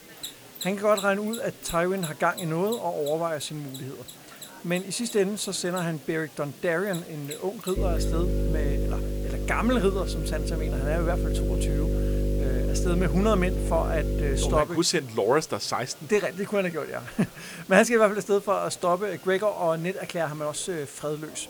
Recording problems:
electrical hum; loud; from 8 to 15 s; 50 Hz, 9 dB below the speech
machinery noise; noticeable; throughout; 15 dB below the speech
murmuring crowd; faint; throughout; 25 dB below the speech
hiss; faint; throughout; 20 dB below the speech

